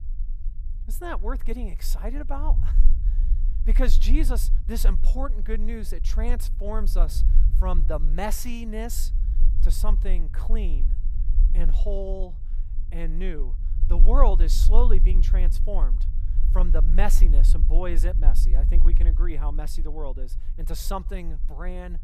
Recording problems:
low rumble; noticeable; throughout; 15 dB below the speech

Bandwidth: 14.5 kHz